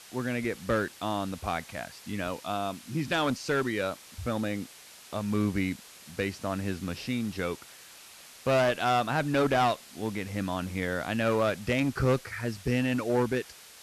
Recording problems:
distortion; slight; 5% of the sound clipped
hiss; noticeable; throughout; 20 dB below the speech

